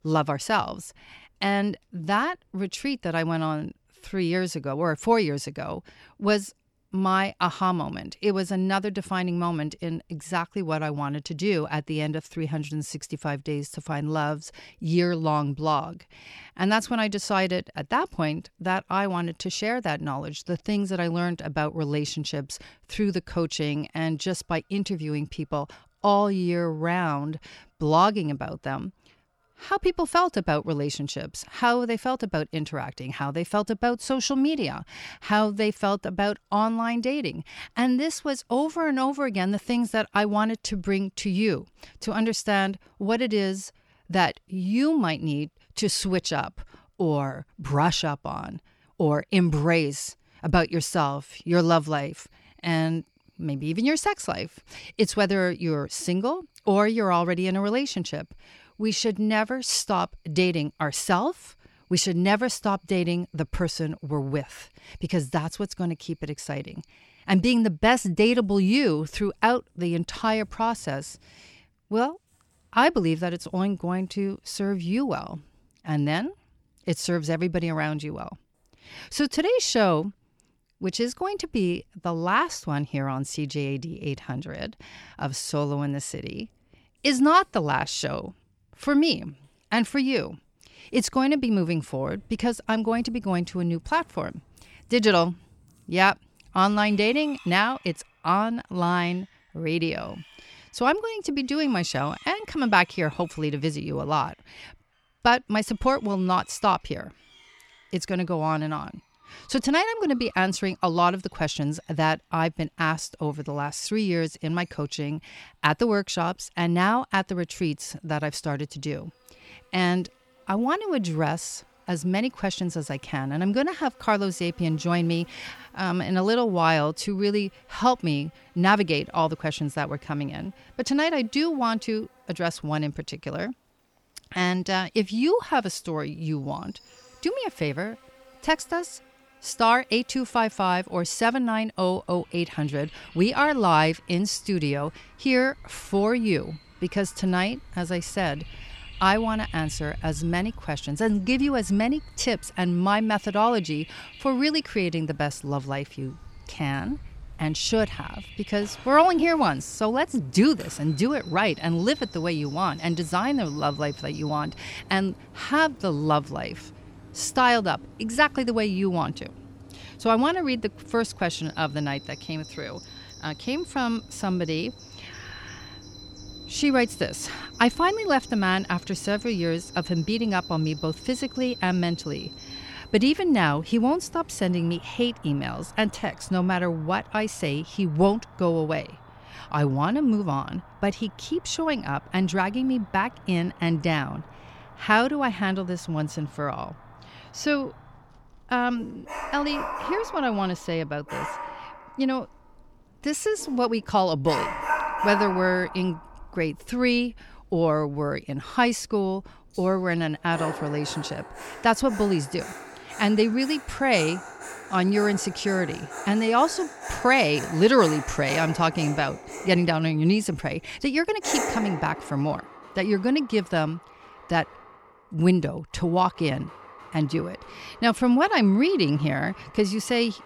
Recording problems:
animal sounds; noticeable; throughout; 15 dB below the speech

